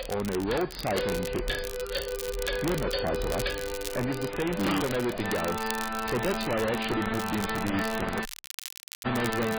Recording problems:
distortion; heavy; 27% of the sound clipped
garbled, watery; badly; nothing above 5 kHz
household noises; loud; throughout; 8 dB below the speech
background music; loud; throughout; 2 dB below the speech
crackle, like an old record; noticeable; 10 dB below the speech
audio cutting out; at 8.5 s for 1 s

